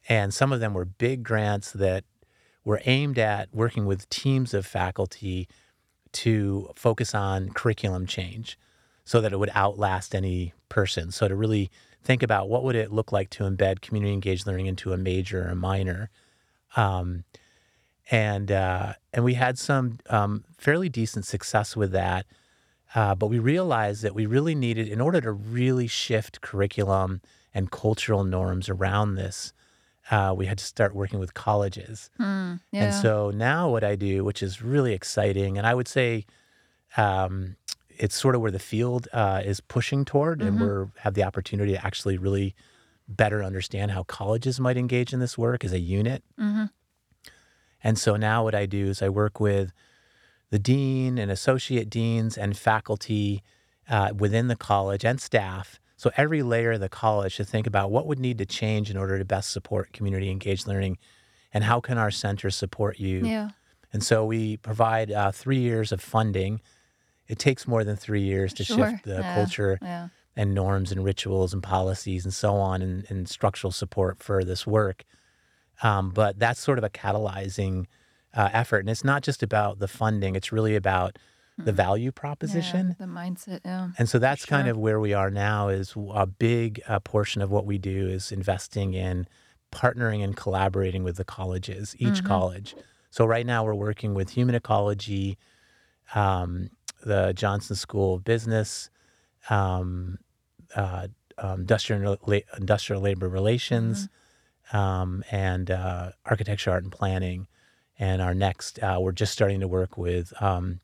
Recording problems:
none

